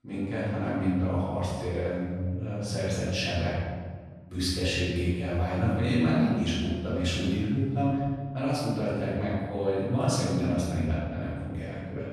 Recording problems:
room echo; strong; dies away in 1.5 s
off-mic speech; far

